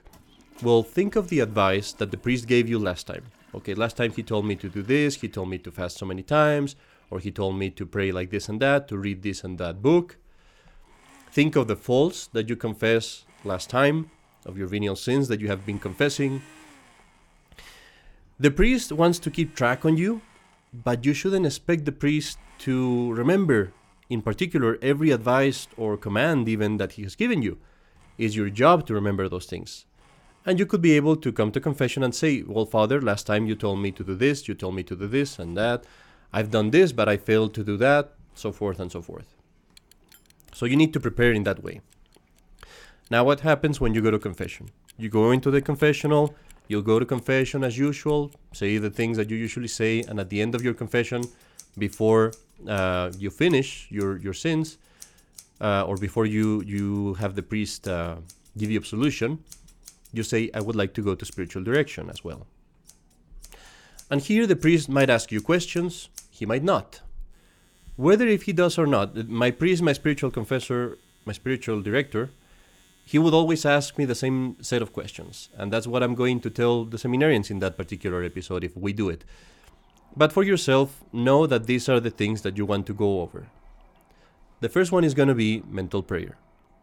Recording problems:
household noises; faint; throughout; 30 dB below the speech

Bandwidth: 17.5 kHz